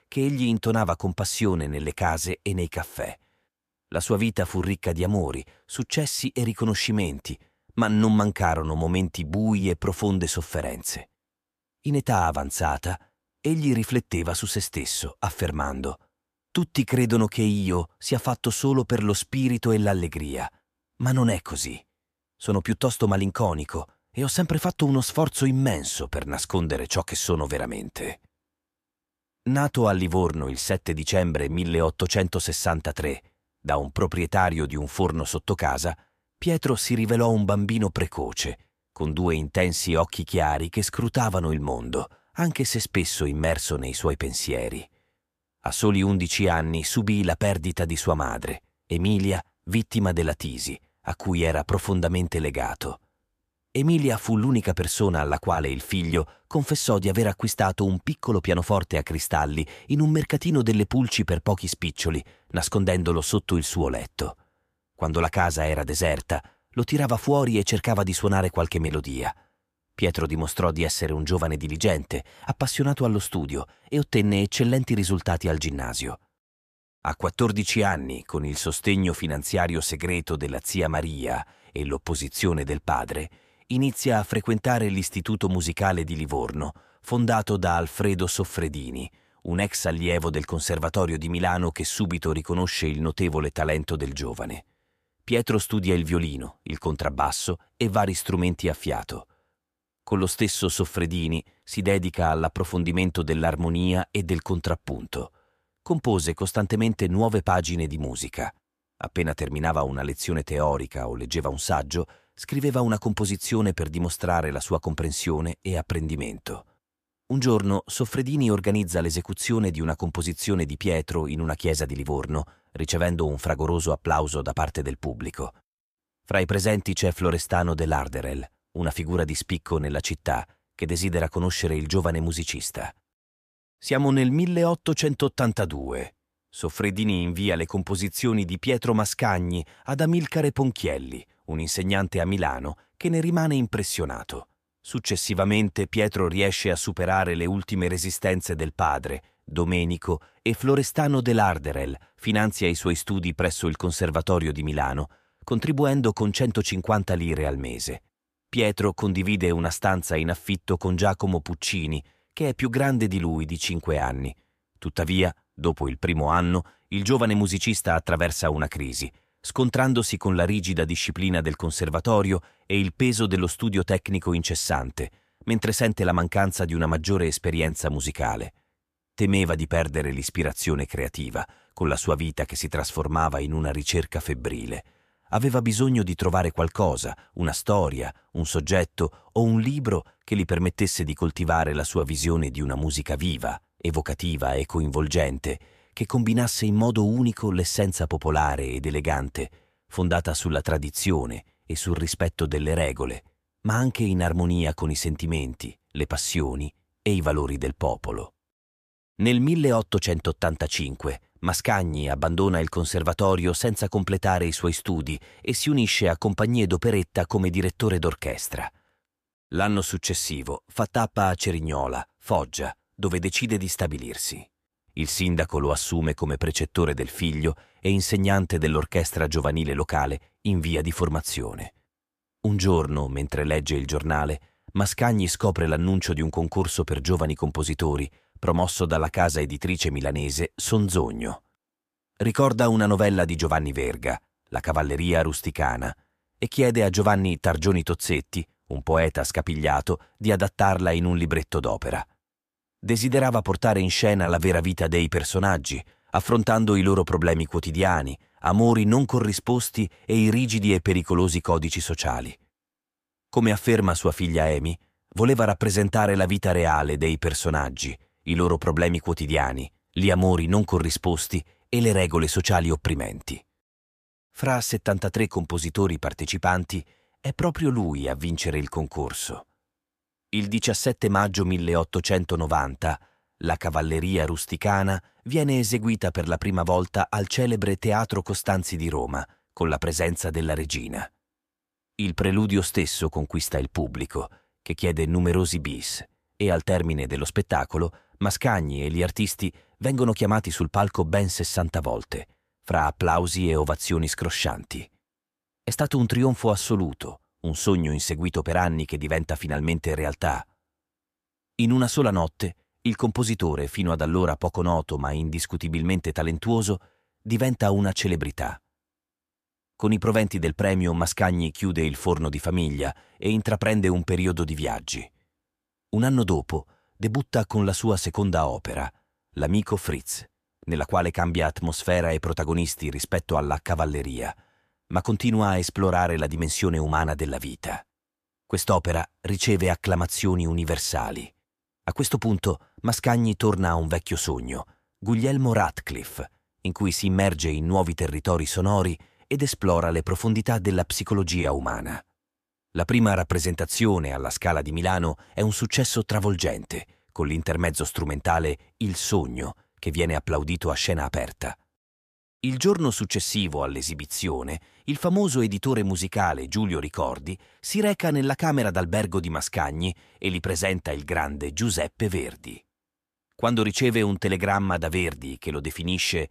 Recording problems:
none

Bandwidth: 14.5 kHz